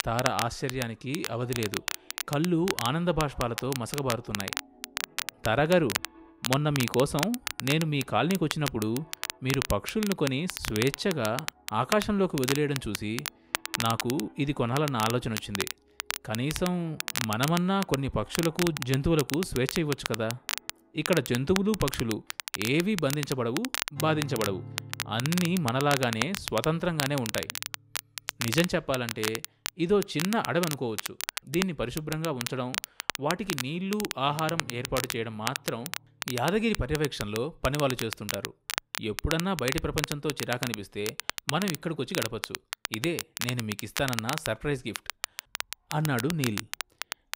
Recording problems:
crackle, like an old record; loud; 5 dB below the speech
background music; faint; throughout; 25 dB below the speech

